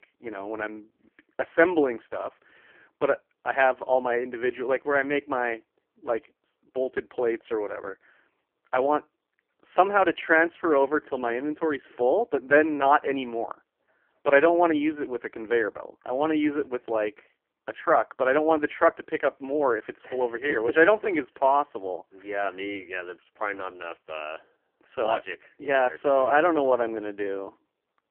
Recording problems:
phone-call audio; poor line; nothing above 3 kHz

